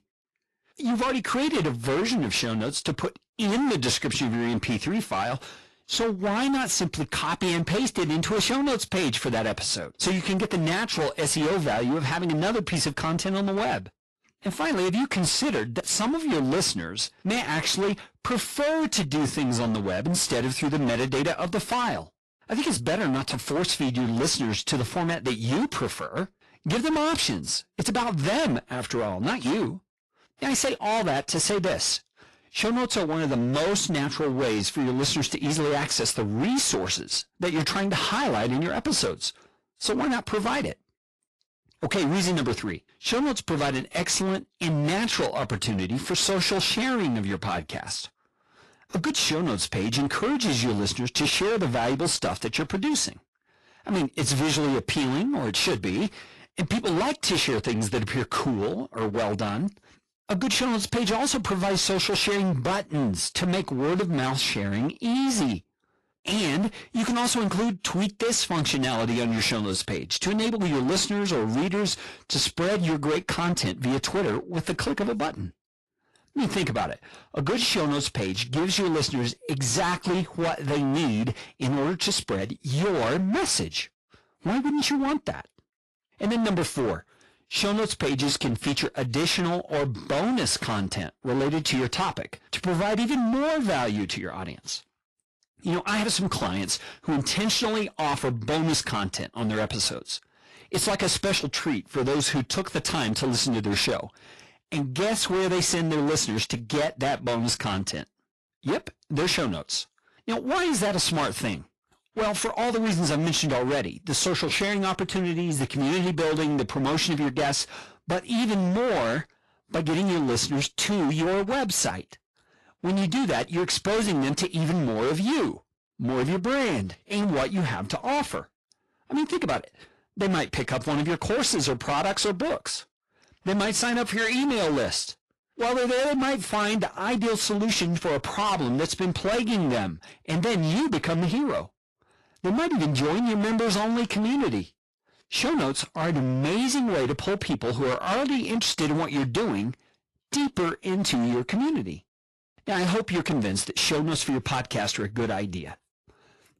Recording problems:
distortion; heavy; 27% of the sound clipped
garbled, watery; slightly; nothing above 11.5 kHz

